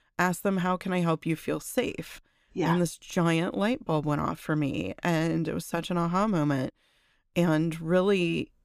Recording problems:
none

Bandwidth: 15 kHz